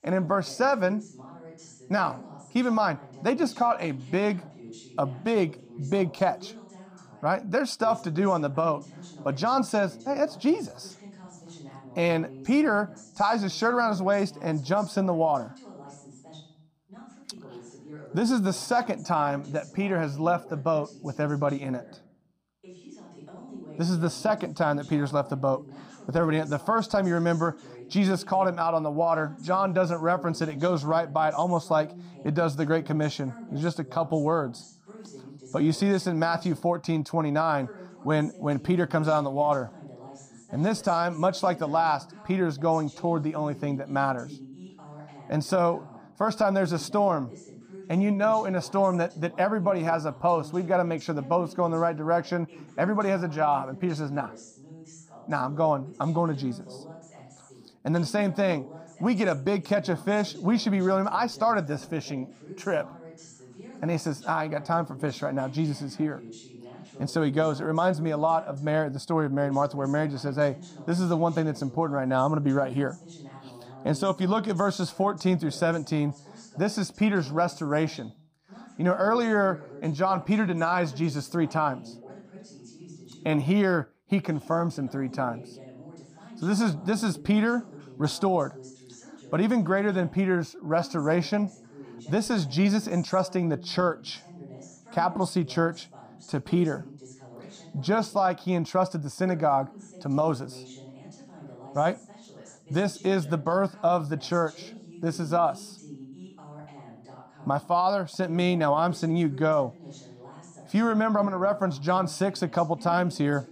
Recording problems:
voice in the background; noticeable; throughout; 20 dB below the speech

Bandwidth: 15 kHz